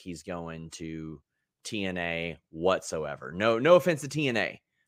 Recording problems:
none

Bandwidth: 15.5 kHz